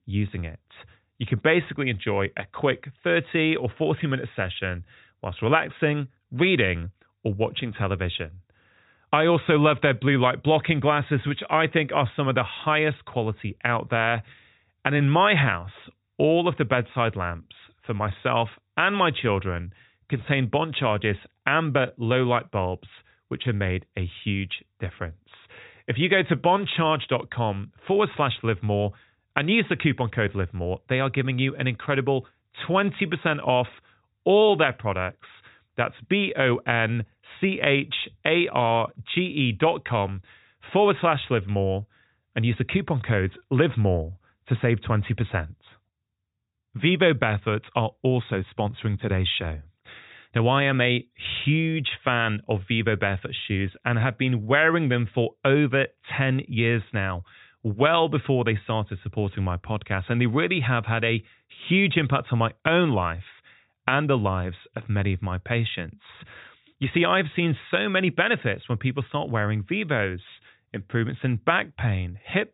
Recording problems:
high frequencies cut off; severe; nothing above 4 kHz

